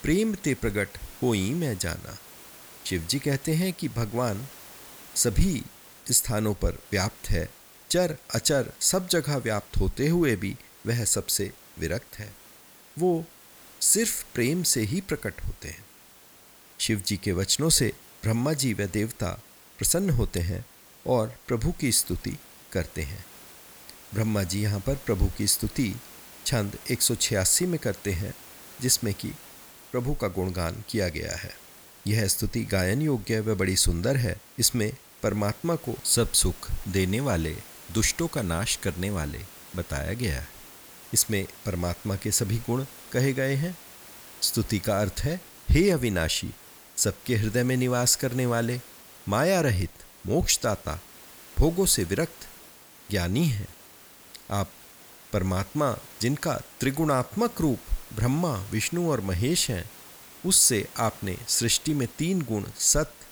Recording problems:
hiss; noticeable; throughout; 20 dB below the speech

